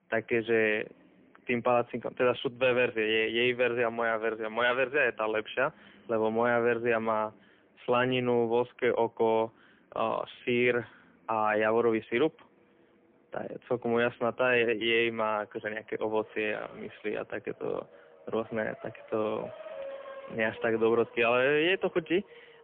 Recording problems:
phone-call audio; poor line; nothing above 3.5 kHz
traffic noise; faint; throughout; 20 dB below the speech

